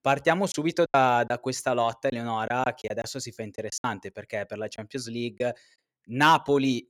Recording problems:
choppy; very; from 0.5 to 4 s and at 5 s; 10% of the speech affected

